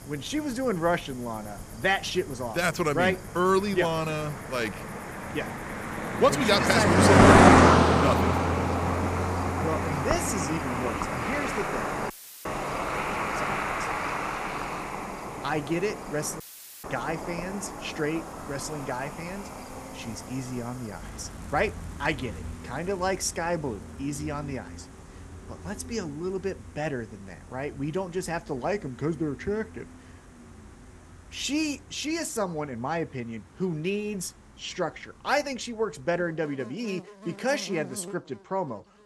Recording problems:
animal sounds; very loud; throughout; 5 dB above the speech
audio cutting out; filled with static; at 12 s and at 16 s

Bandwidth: 15 kHz